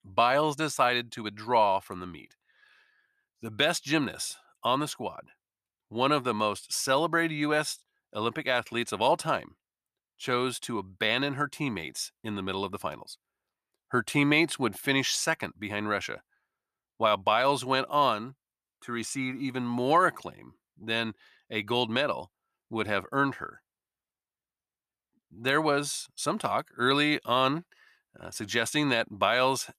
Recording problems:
none

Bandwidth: 14.5 kHz